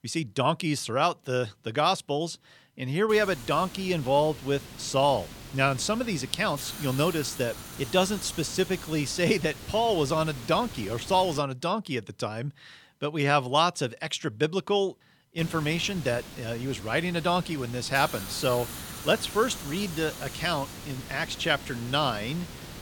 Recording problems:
hiss; noticeable; from 3 to 11 s and from 15 s on; 15 dB below the speech

